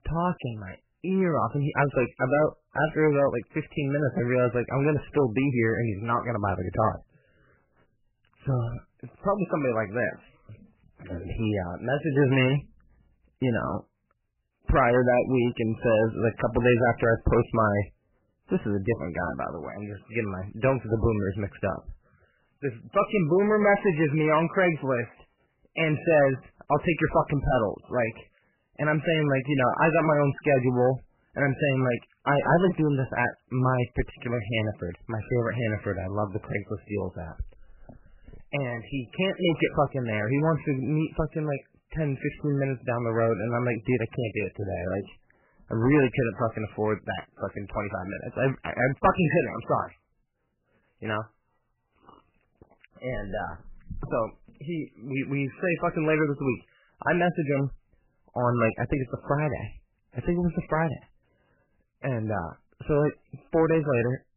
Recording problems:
garbled, watery; badly; nothing above 3 kHz
distortion; slight; 3% of the sound clipped

